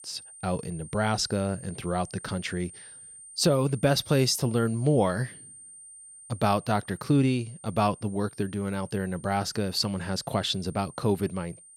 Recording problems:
high-pitched whine; noticeable; throughout; 9 kHz, 20 dB below the speech

